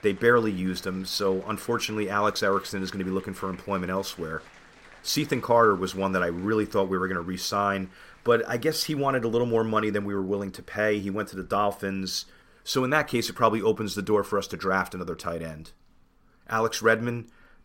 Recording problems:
crowd noise; faint; throughout; 25 dB below the speech

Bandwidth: 16 kHz